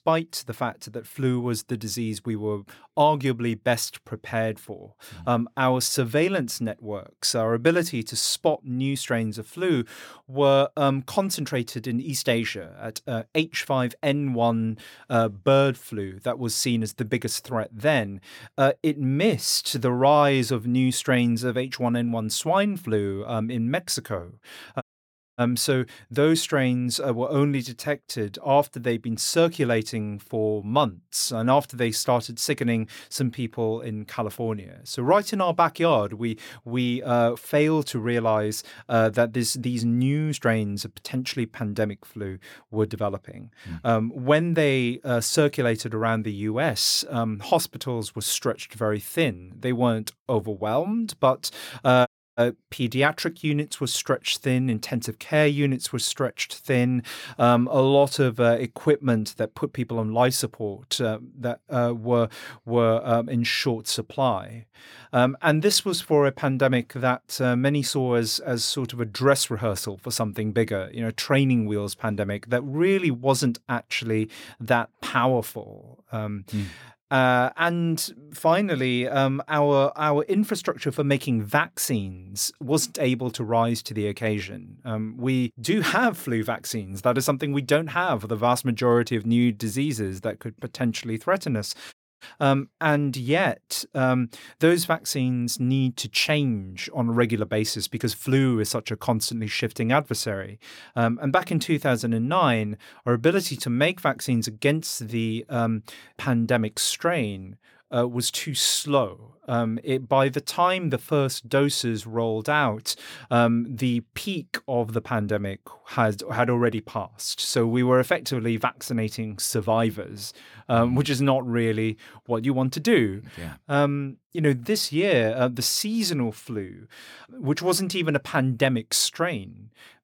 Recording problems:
audio cutting out; at 25 s for 0.5 s, at 52 s and at 1:32

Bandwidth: 17 kHz